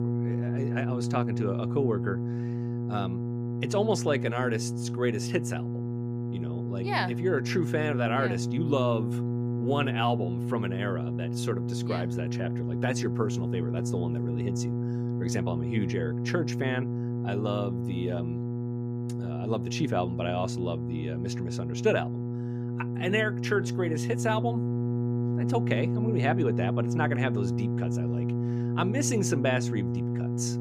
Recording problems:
electrical hum; loud; throughout; 60 Hz, 6 dB below the speech

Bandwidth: 15 kHz